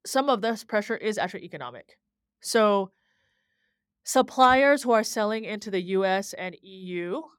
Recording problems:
none

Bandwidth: 18.5 kHz